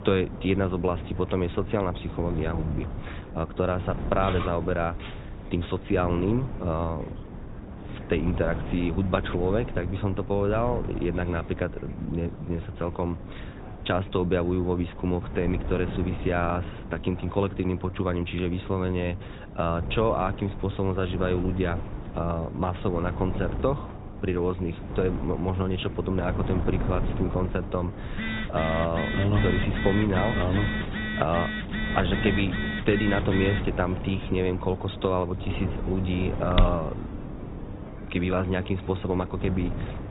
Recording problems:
high frequencies cut off; severe; nothing above 4 kHz
garbled, watery; slightly
wind noise on the microphone; occasional gusts; 15 dB below the speech
electrical hum; faint; throughout; 50 Hz, 25 dB below the speech
background chatter; faint; throughout; 4 voices, 20 dB below the speech
clattering dishes; noticeable; from 4 to 6 s; peak 8 dB below the speech
phone ringing; noticeable; from 28 to 34 s; peak 3 dB below the speech
footsteps; loud; at 37 s; peak 1 dB above the speech

